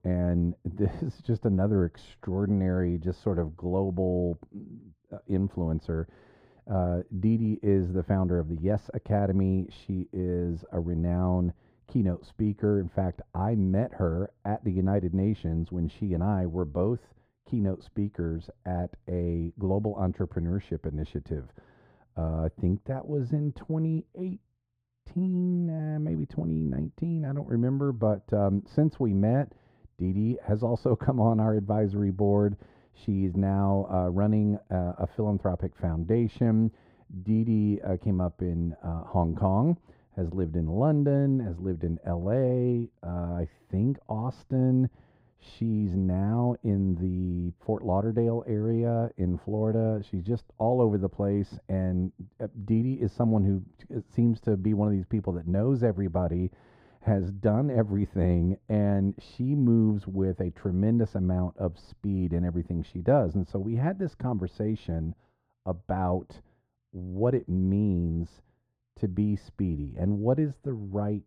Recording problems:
muffled; very; fading above 2 kHz

